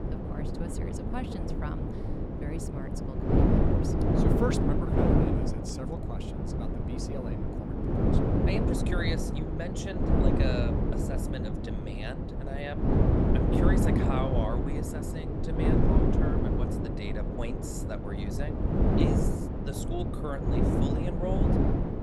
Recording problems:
wind noise on the microphone; heavy; 5 dB above the speech

